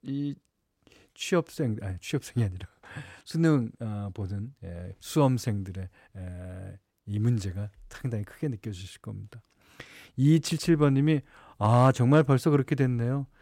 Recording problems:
none

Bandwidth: 16 kHz